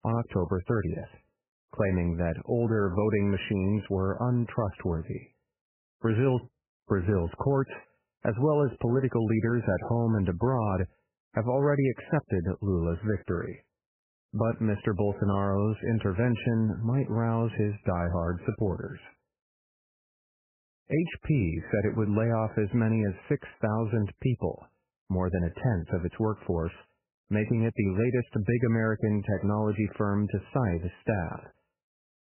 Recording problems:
garbled, watery; badly; nothing above 3 kHz

